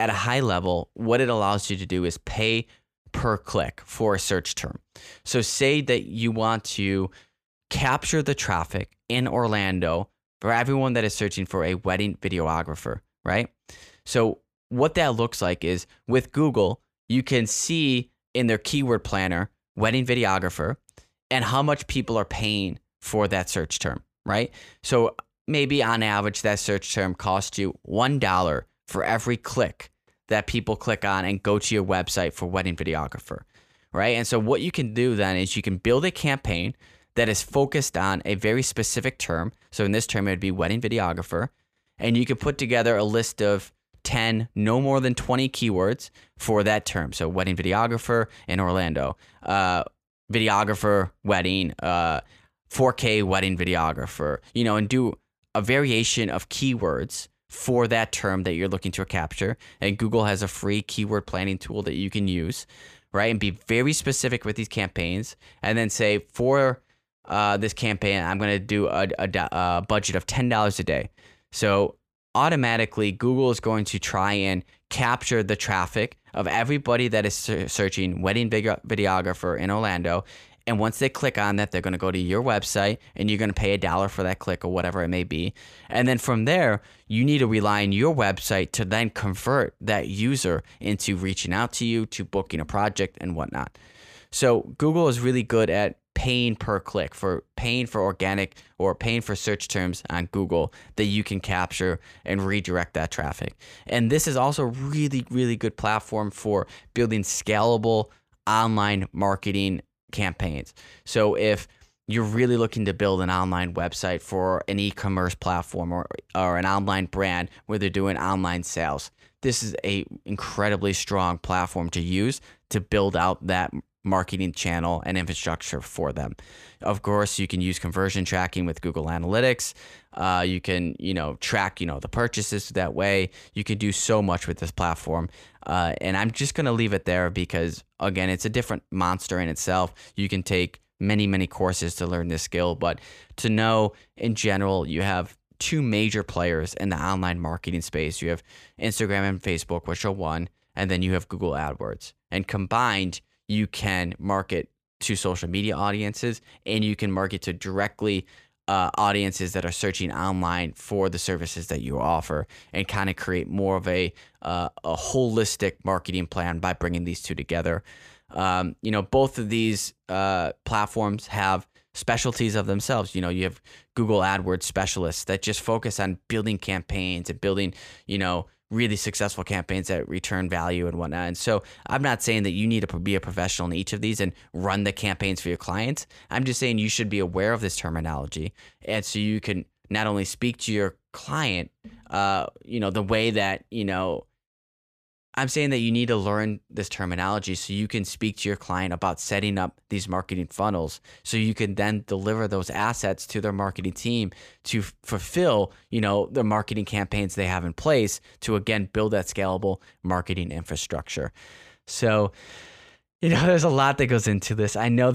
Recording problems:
abrupt cut into speech; at the start and the end

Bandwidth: 14.5 kHz